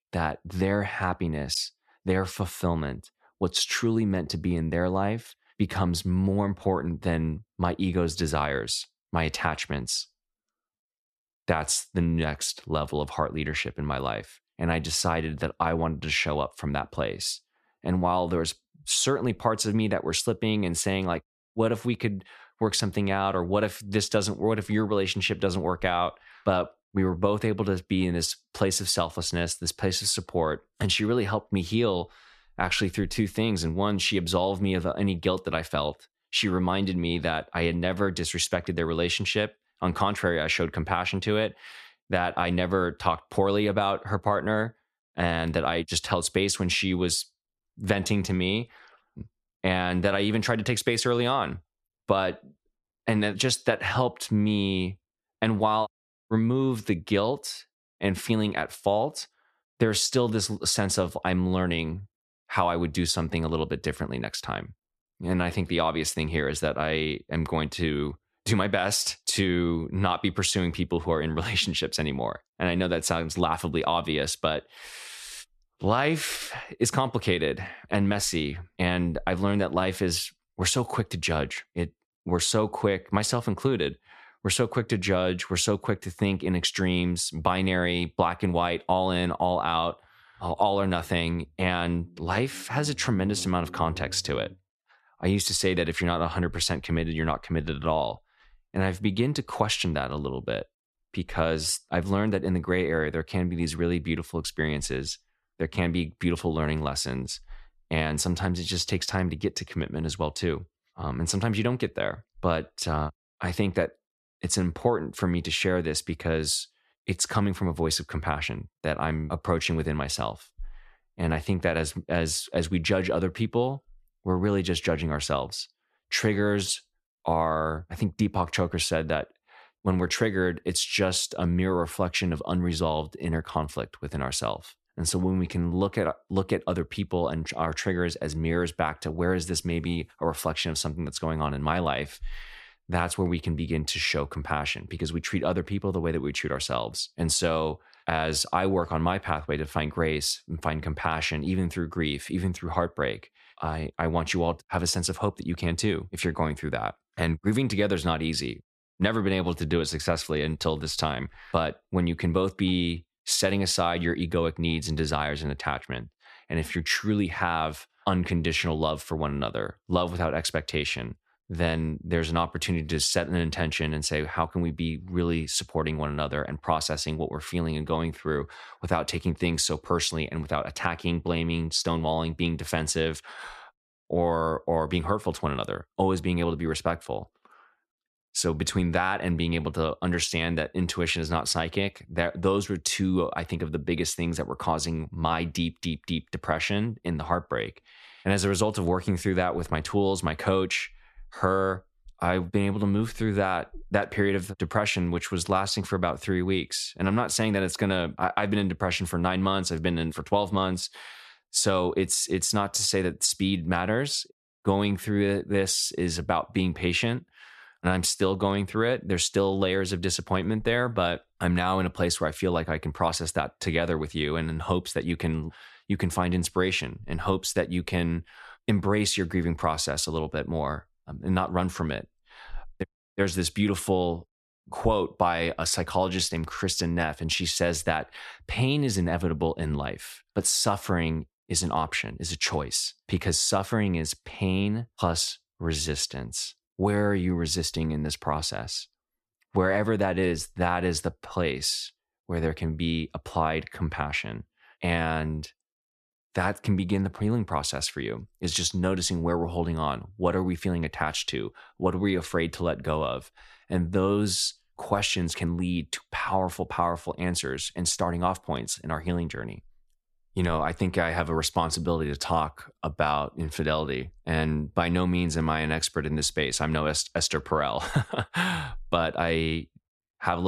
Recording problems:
abrupt cut into speech; at the end

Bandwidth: 13.5 kHz